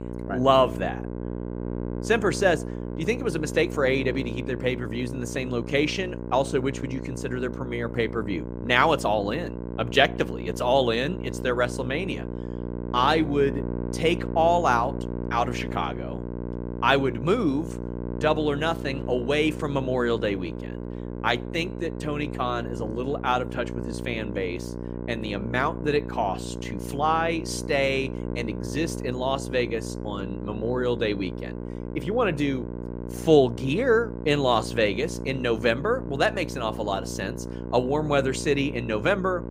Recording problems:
electrical hum; noticeable; throughout; 60 Hz, 15 dB below the speech

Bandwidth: 15.5 kHz